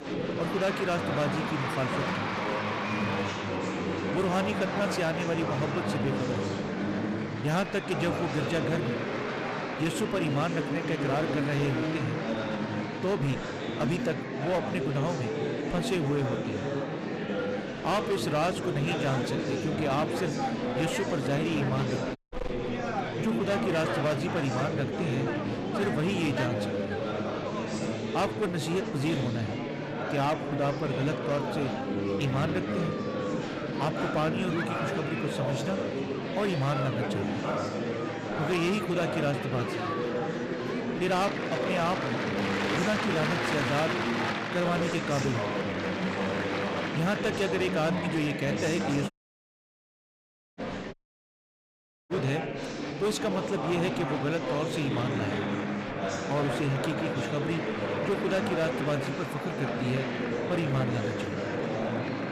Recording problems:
distortion; slight; 11% of the sound clipped
murmuring crowd; loud; throughout; as loud as the speech
audio cutting out; at 22 s, at 49 s for 1.5 s and at 51 s for 1 s

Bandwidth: 14.5 kHz